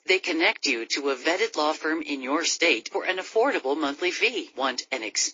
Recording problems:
thin; very; fading below 300 Hz
garbled, watery; slightly

